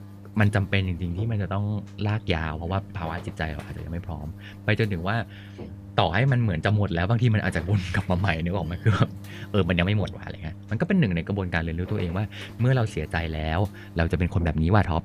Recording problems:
electrical hum; noticeable; throughout; 50 Hz, 20 dB below the speech

